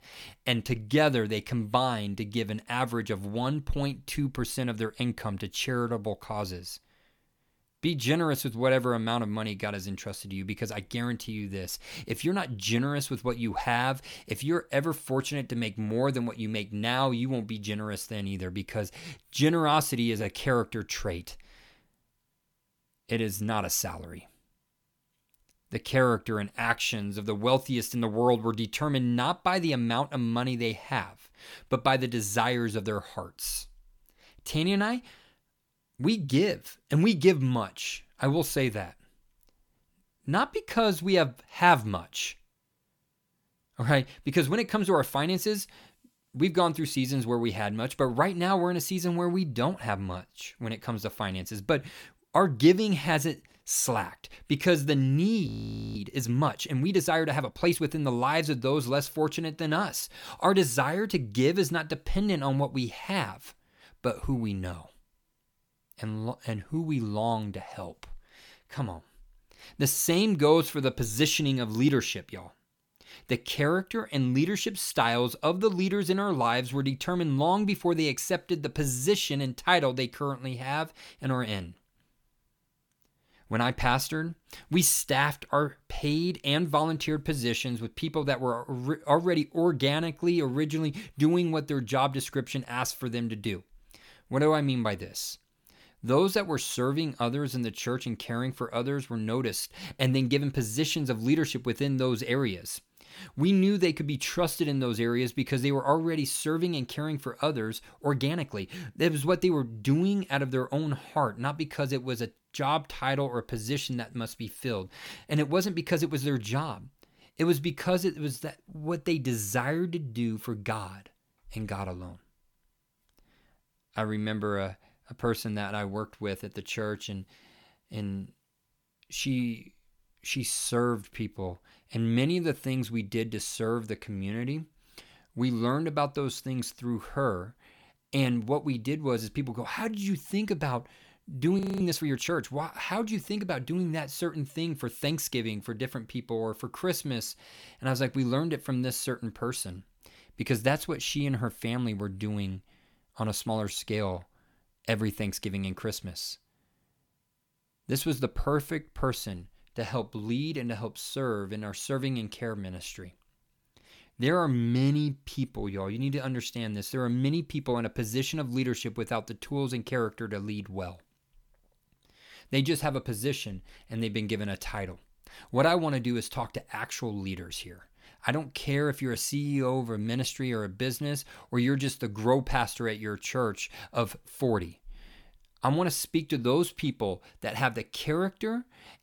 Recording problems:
audio freezing; at 55 s and at 2:22

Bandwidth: 18 kHz